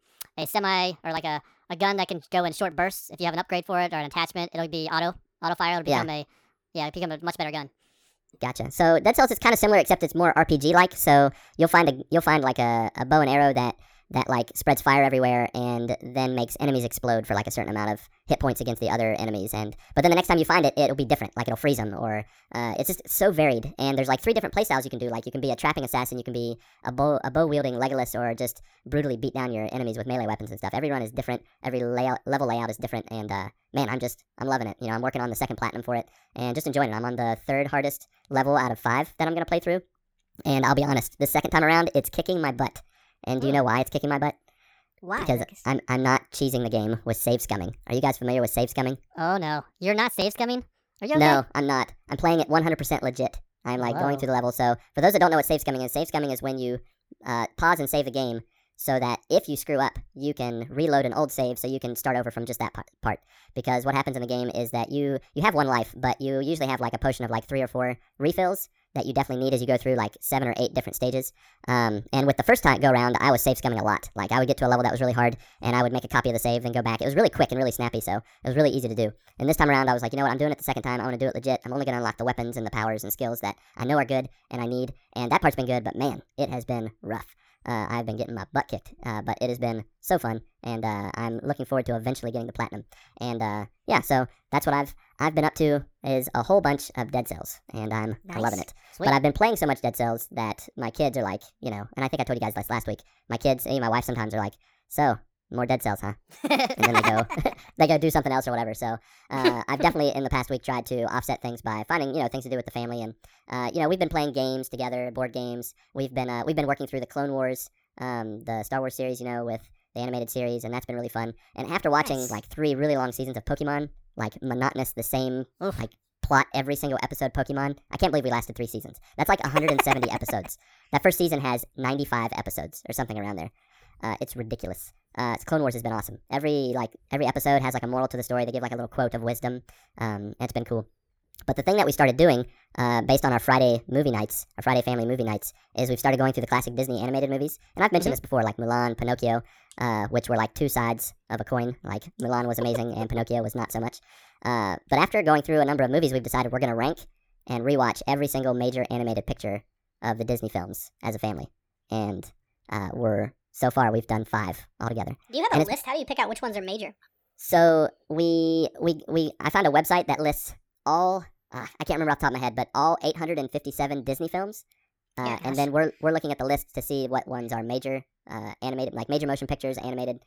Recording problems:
wrong speed and pitch; too fast and too high; 1.5 times normal speed

